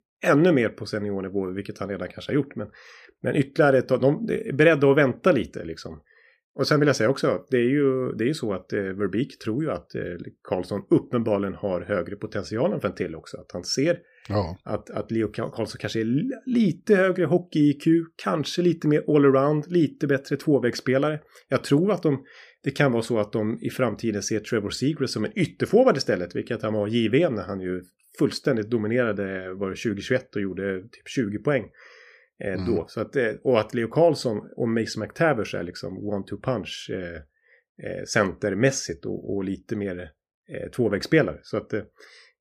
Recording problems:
none

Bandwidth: 15 kHz